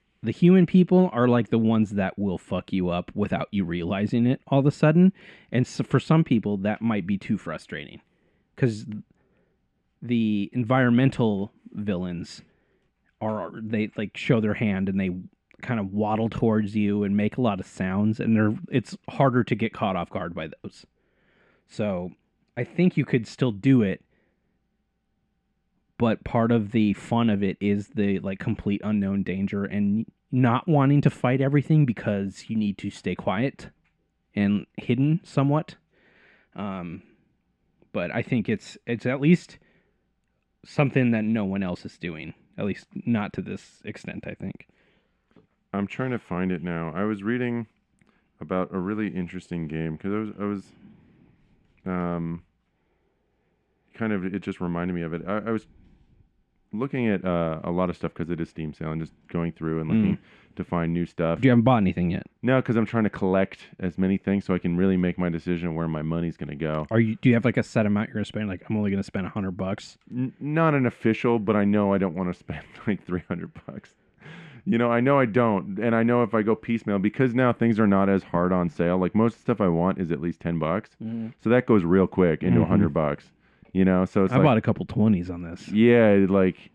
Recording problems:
muffled; very; fading above 2.5 kHz

